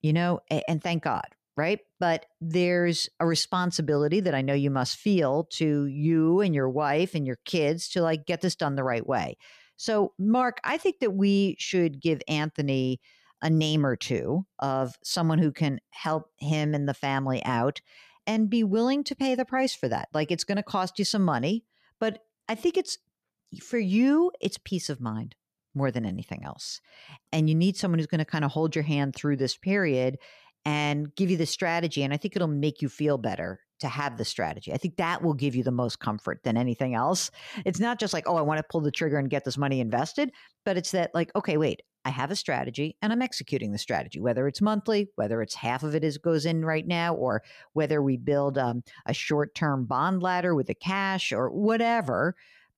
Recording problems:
none

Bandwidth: 14.5 kHz